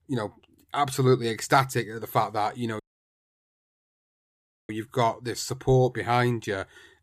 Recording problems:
audio cutting out; at 3 s for 2 s

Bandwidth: 14.5 kHz